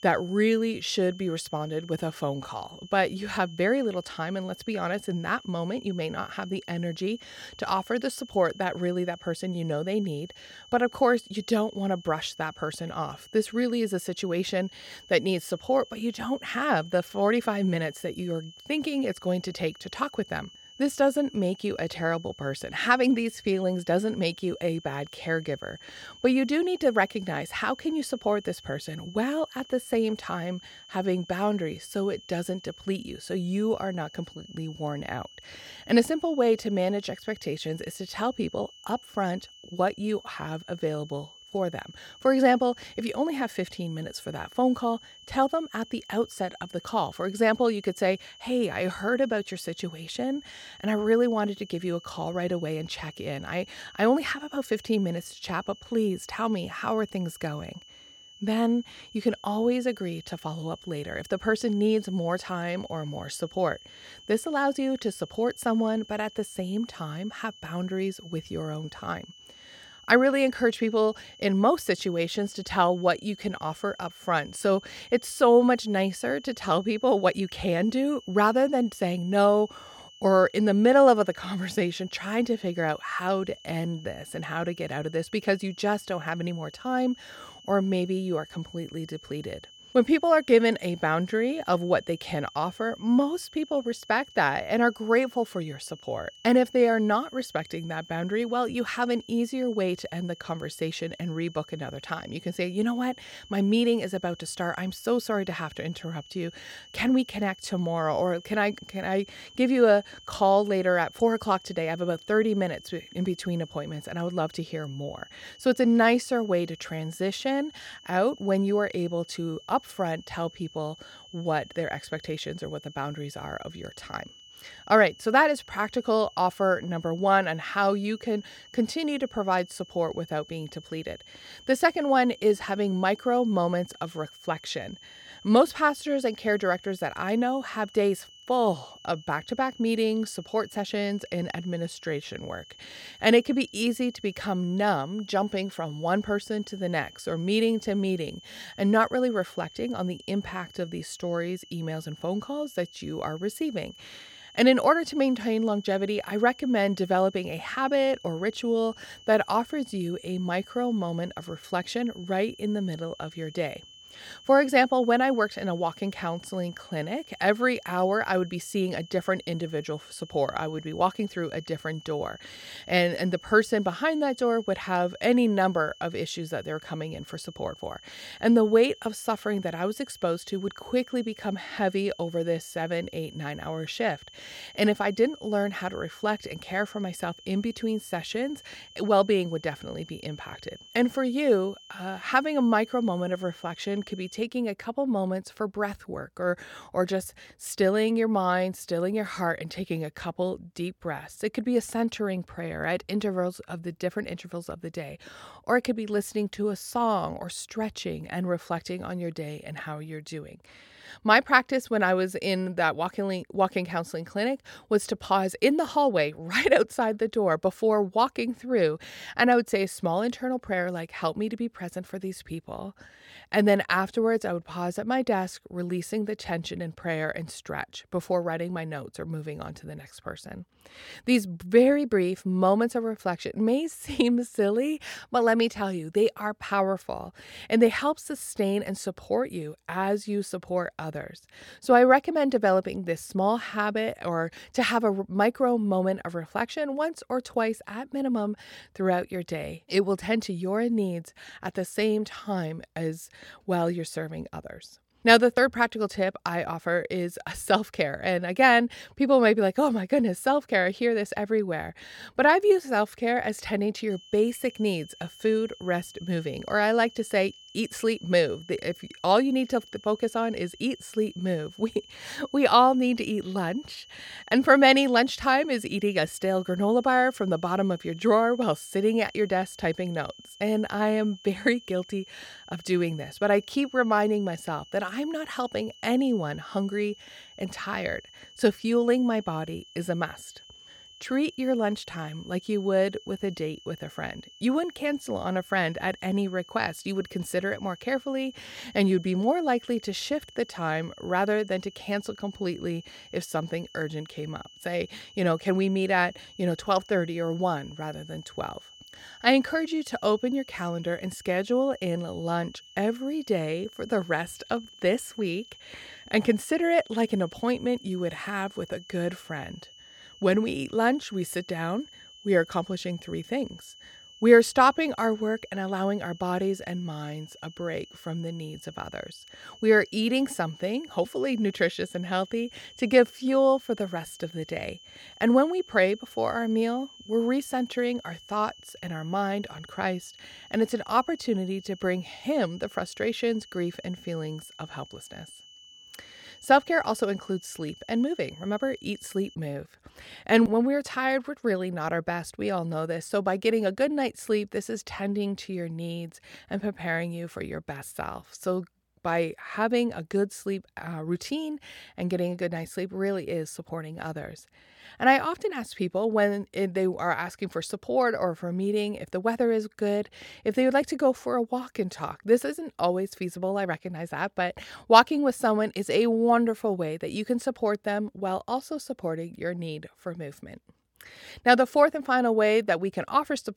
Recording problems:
high-pitched whine; faint; until 3:14 and from 4:24 to 5:50; 3 kHz, 20 dB below the speech

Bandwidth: 17.5 kHz